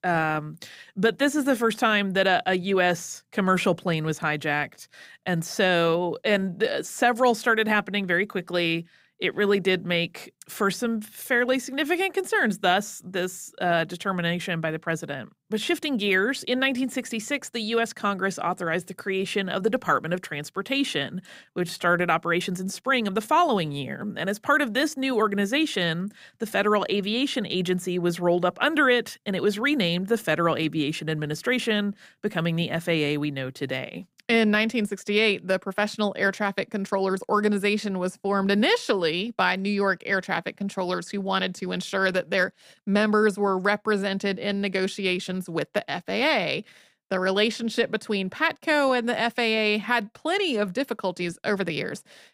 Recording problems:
uneven, jittery; slightly; from 21 to 44 s

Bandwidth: 15.5 kHz